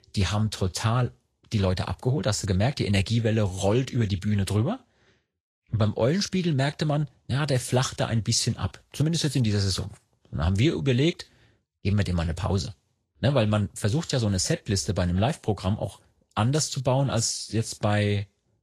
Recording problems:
garbled, watery; slightly; nothing above 10.5 kHz

